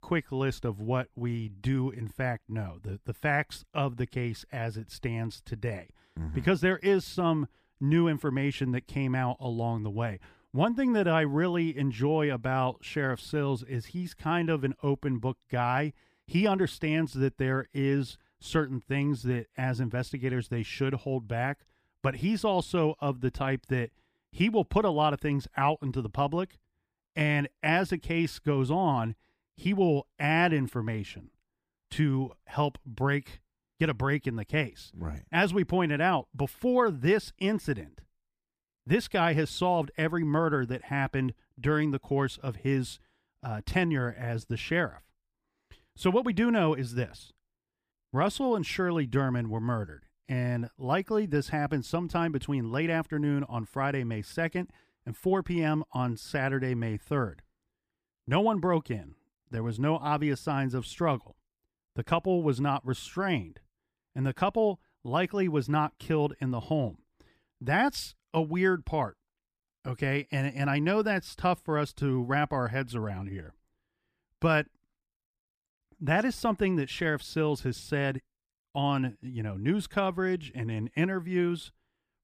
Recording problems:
none

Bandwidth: 15 kHz